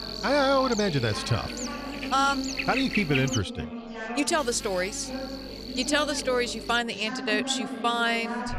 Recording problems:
electrical hum; loud; until 3.5 s and from 4.5 to 7 s; 50 Hz, 8 dB below the speech
background chatter; noticeable; throughout; 4 voices, 10 dB below the speech

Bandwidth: 14.5 kHz